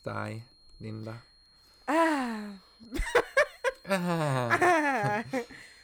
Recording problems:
high-pitched whine; faint; throughout; 4 kHz, 30 dB below the speech

